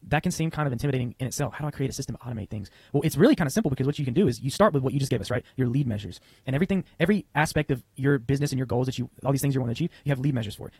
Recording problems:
wrong speed, natural pitch; too fast; 1.7 times normal speed
garbled, watery; slightly; nothing above 13 kHz

